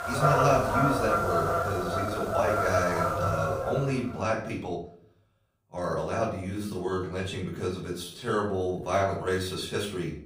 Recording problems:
off-mic speech; far
room echo; slight; dies away in 0.4 s
animal sounds; very loud; until 3.5 s; 2 dB above the speech
uneven, jittery; strongly; from 1.5 to 9.5 s

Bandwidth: 15.5 kHz